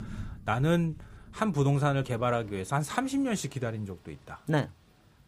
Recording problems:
rain or running water; faint; throughout; 20 dB below the speech

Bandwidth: 15 kHz